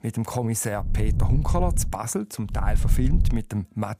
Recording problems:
low rumble; noticeable; from 1 to 2 s and at 2.5 s; 10 dB below the speech

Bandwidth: 15.5 kHz